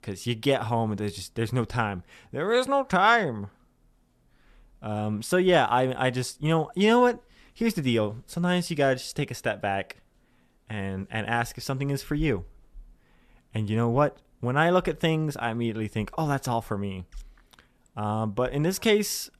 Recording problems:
none

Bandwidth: 13.5 kHz